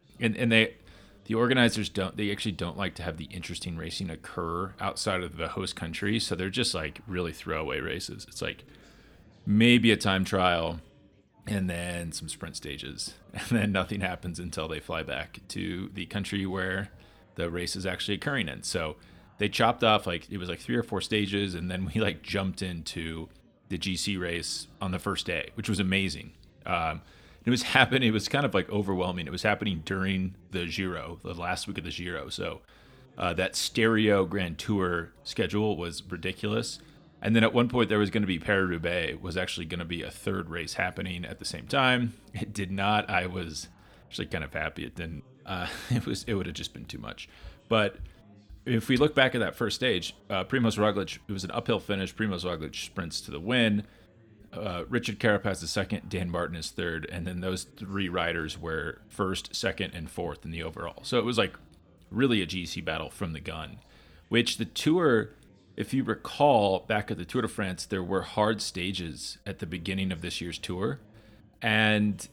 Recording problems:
background chatter; faint; throughout; 4 voices, 30 dB below the speech

